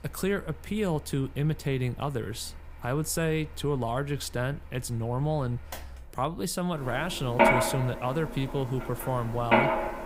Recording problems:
machinery noise; very loud; throughout; 2 dB above the speech

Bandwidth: 15.5 kHz